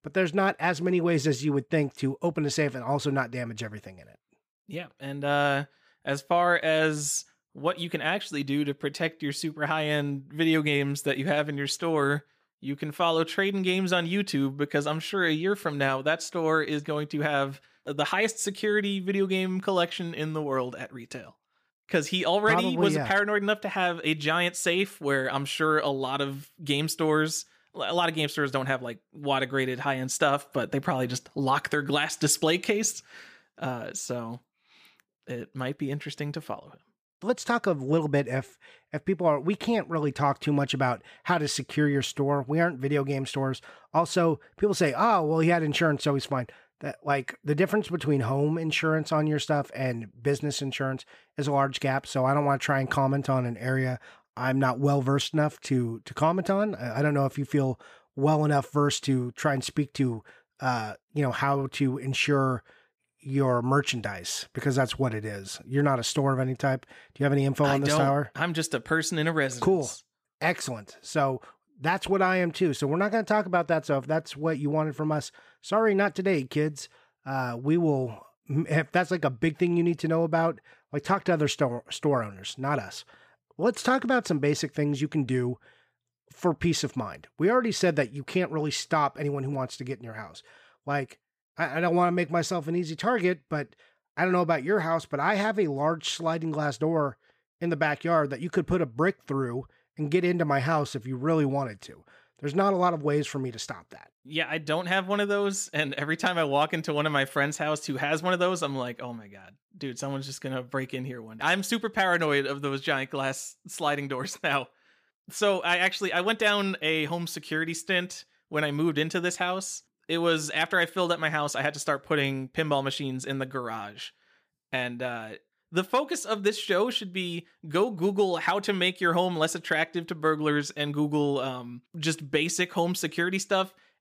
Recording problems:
none

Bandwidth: 15 kHz